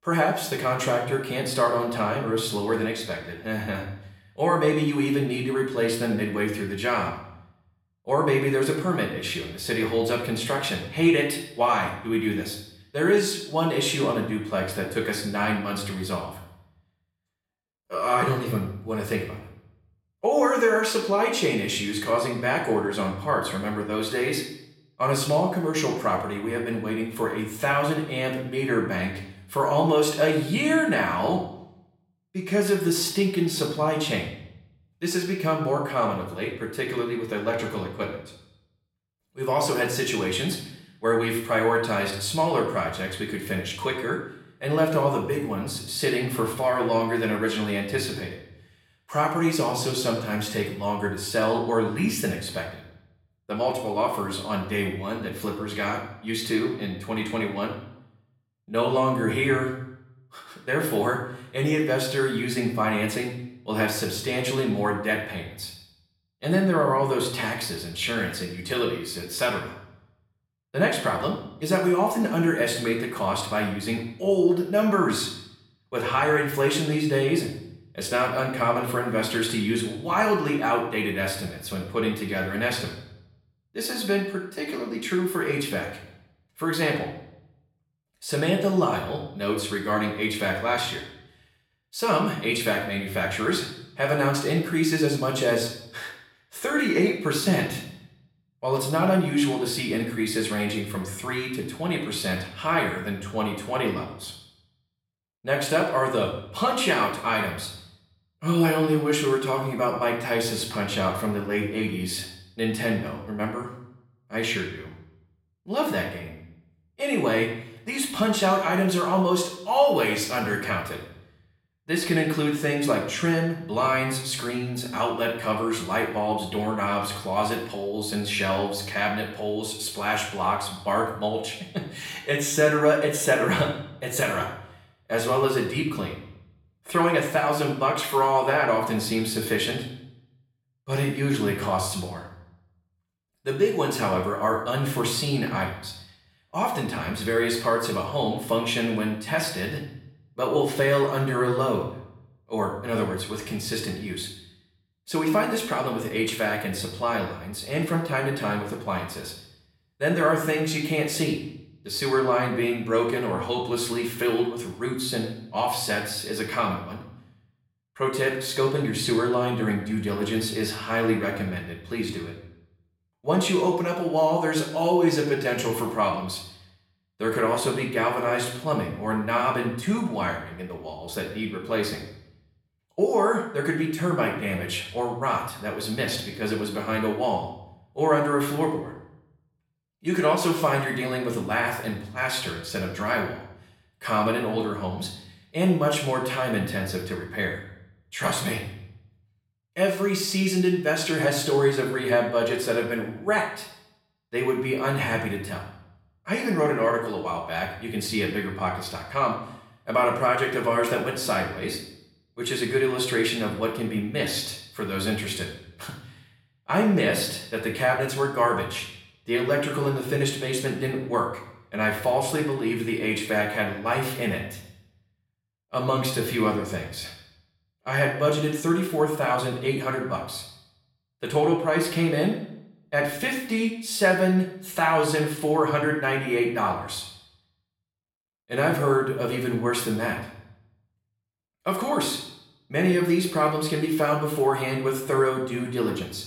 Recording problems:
off-mic speech; far
room echo; noticeable; dies away in 0.6 s

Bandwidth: 16.5 kHz